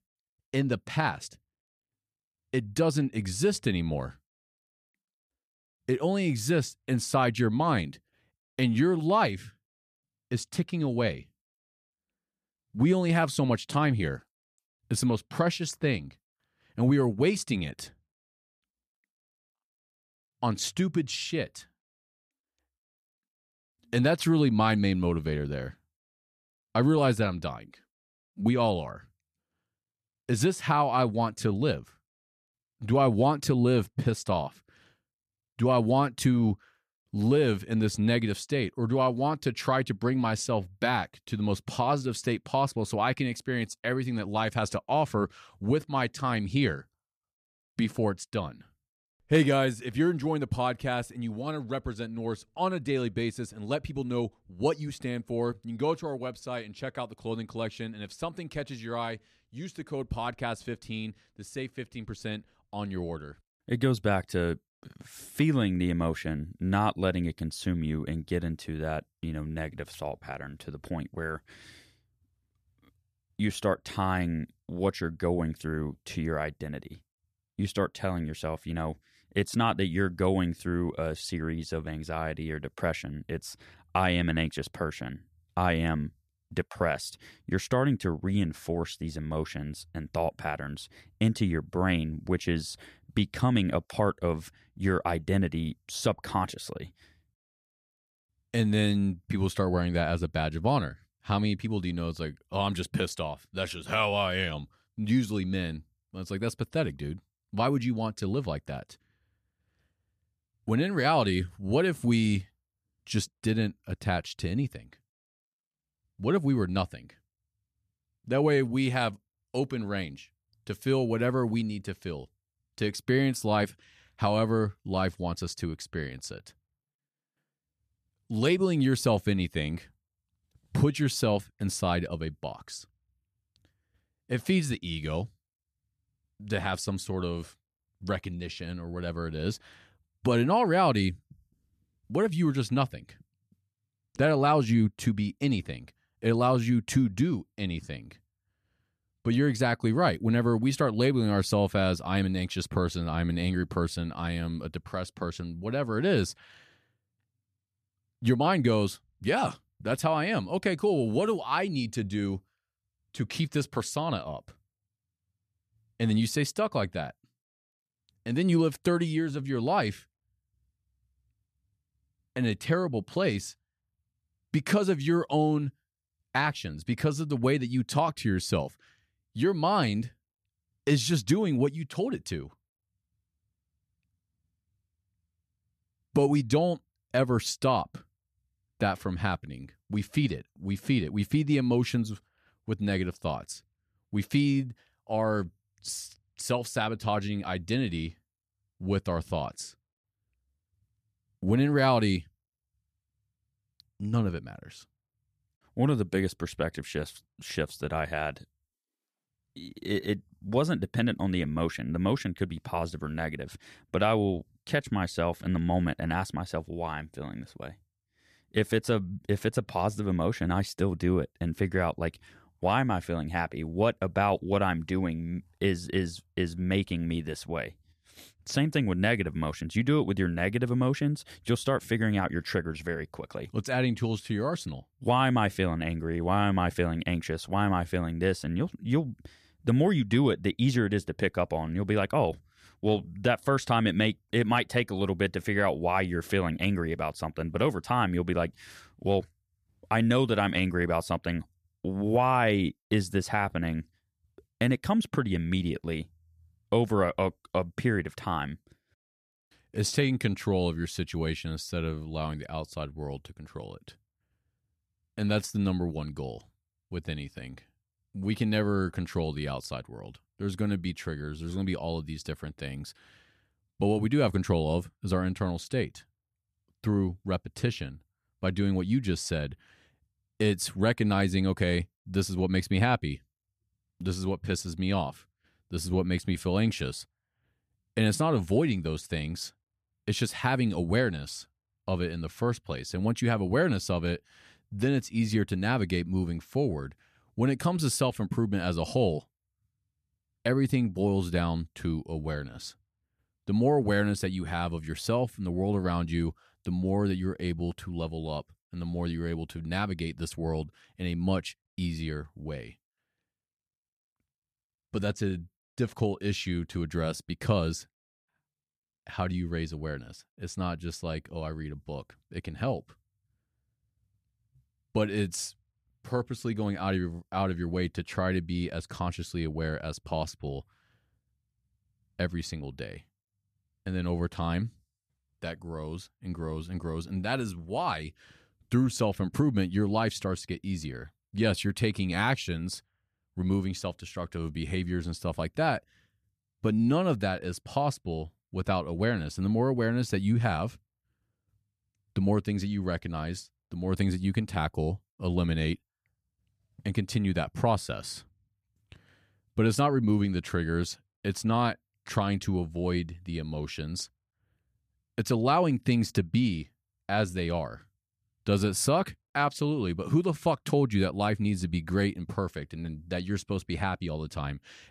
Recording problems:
none

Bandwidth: 14.5 kHz